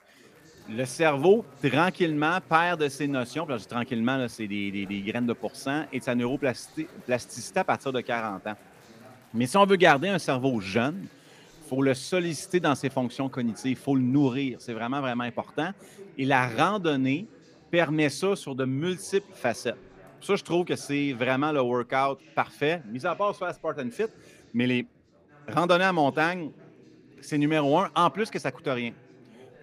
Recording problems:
chatter from many people; faint; throughout; 25 dB below the speech

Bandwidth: 15 kHz